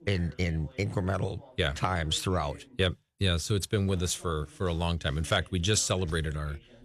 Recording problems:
voice in the background; faint; throughout; 25 dB below the speech

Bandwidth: 13.5 kHz